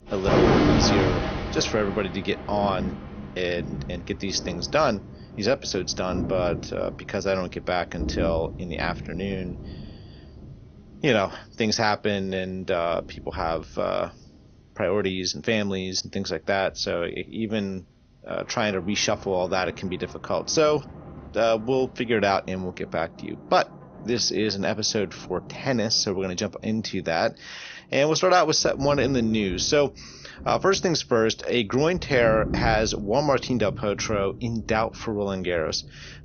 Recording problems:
garbled, watery; slightly; nothing above 6.5 kHz
rain or running water; loud; throughout; 6 dB below the speech
high-pitched whine; very faint; throughout; 6 kHz, 65 dB below the speech

